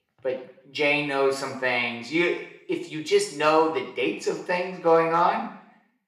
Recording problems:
room echo; slight; dies away in 0.7 s
off-mic speech; somewhat distant

